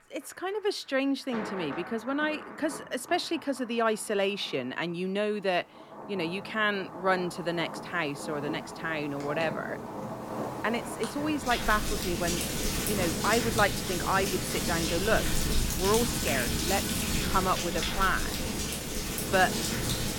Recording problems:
rain or running water; loud; throughout; 2 dB below the speech

